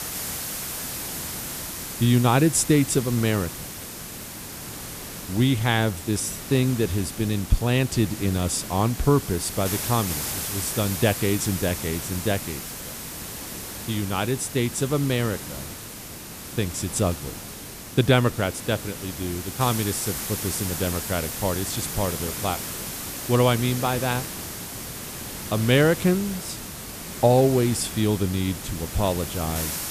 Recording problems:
hiss; loud; throughout; 8 dB below the speech

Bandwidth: 14.5 kHz